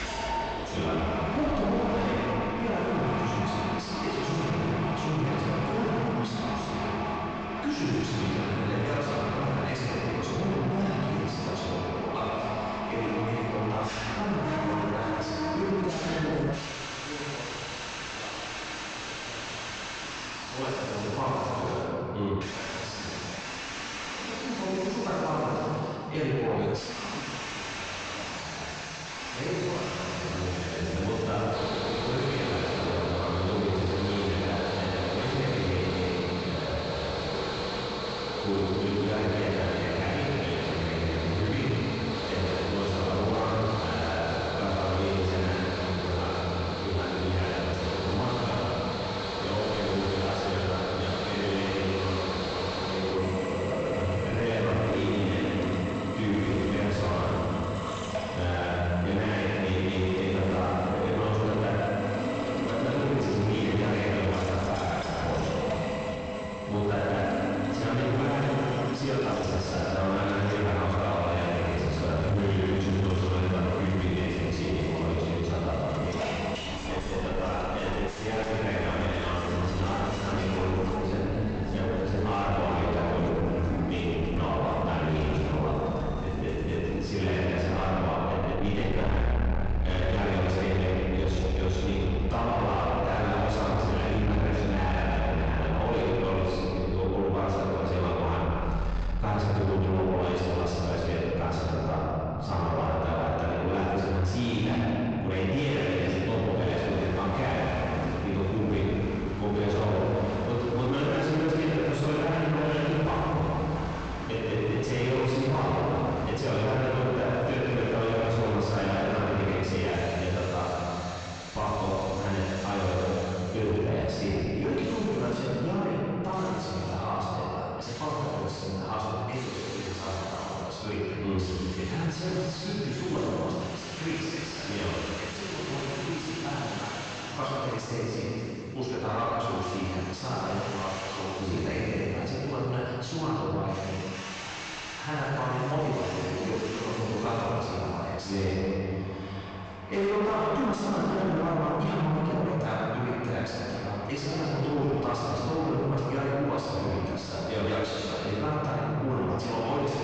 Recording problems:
distortion; heavy; 6 dB below the speech
room echo; strong; dies away in 2.3 s
off-mic speech; far
high frequencies cut off; noticeable; nothing above 8 kHz
machinery noise; very faint; throughout; 5 dB below the speech

